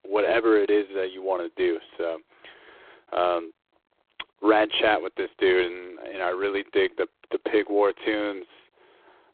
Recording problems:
phone-call audio; poor line

